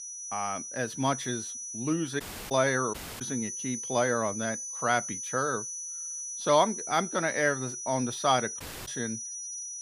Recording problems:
high-pitched whine; loud; throughout; 6 kHz, 6 dB below the speech
audio cutting out; at 2 s, at 3 s and at 8.5 s

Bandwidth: 15 kHz